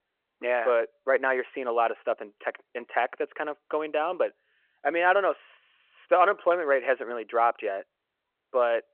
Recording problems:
phone-call audio

